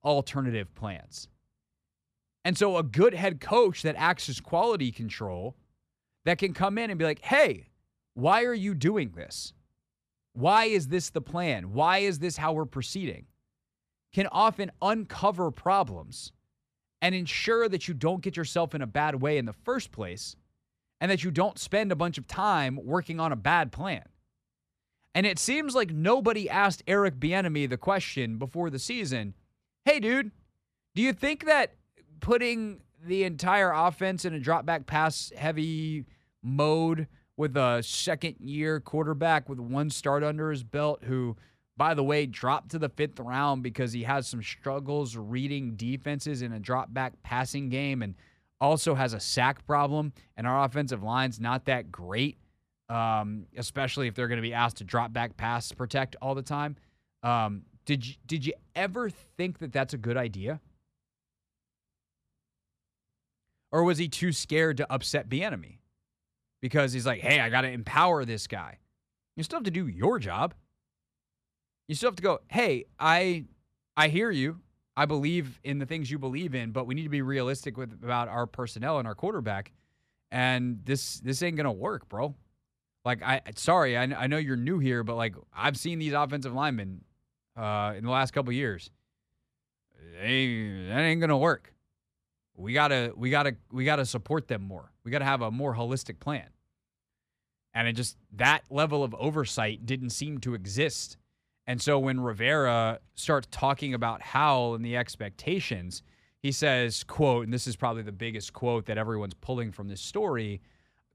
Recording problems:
none

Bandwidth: 14.5 kHz